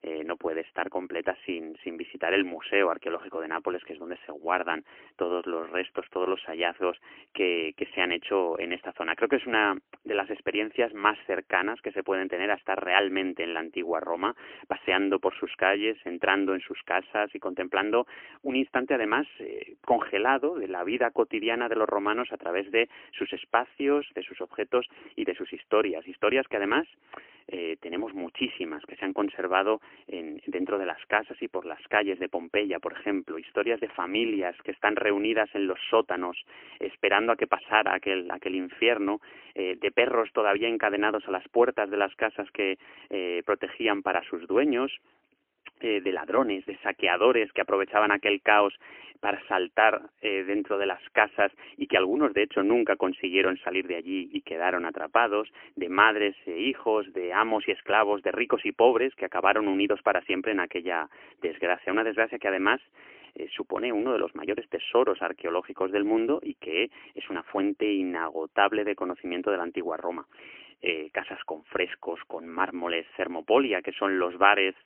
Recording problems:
phone-call audio; poor line; nothing above 3 kHz

